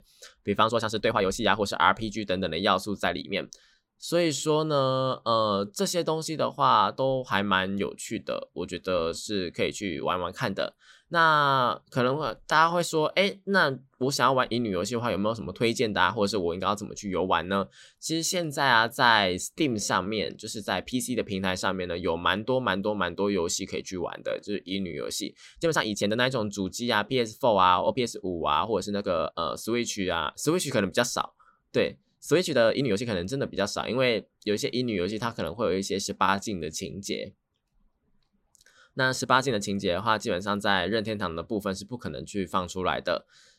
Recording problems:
uneven, jittery; strongly; from 0.5 to 40 s

